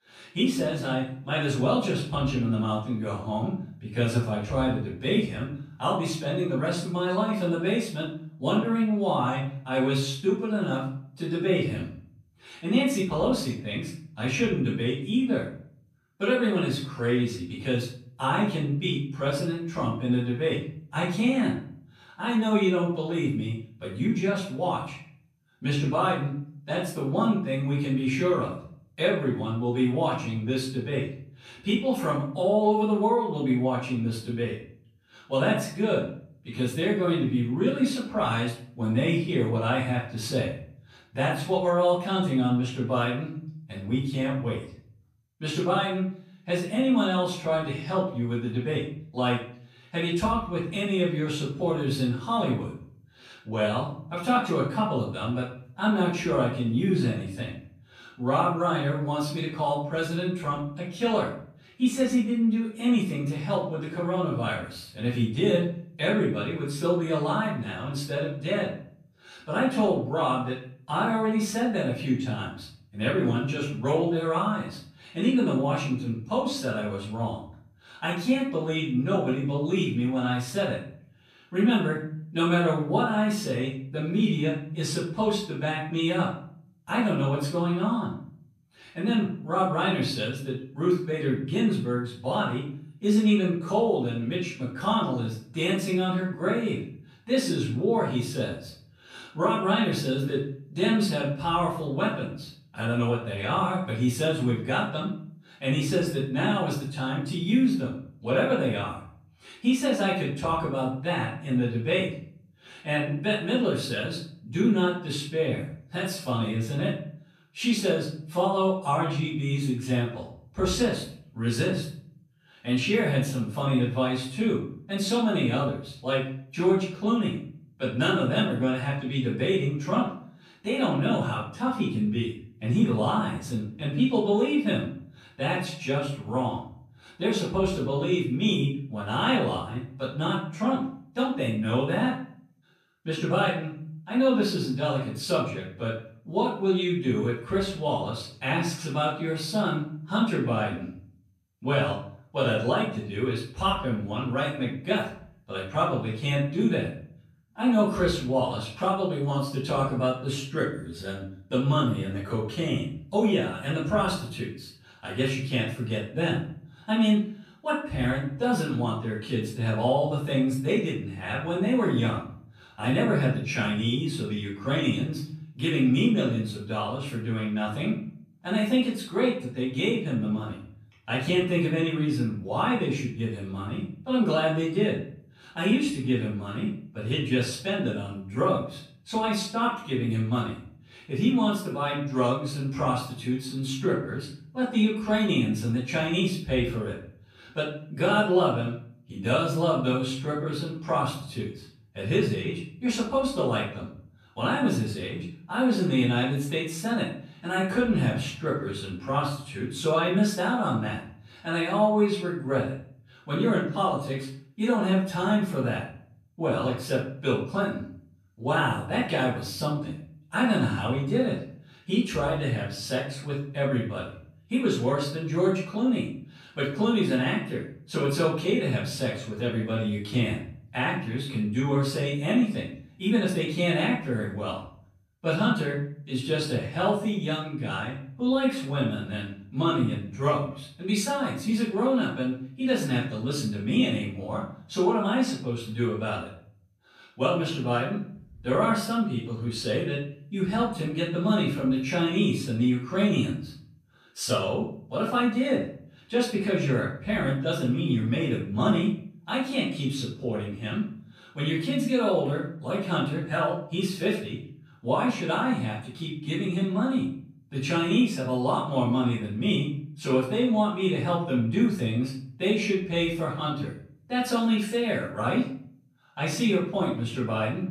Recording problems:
off-mic speech; far
room echo; noticeable; dies away in 0.5 s

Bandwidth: 14.5 kHz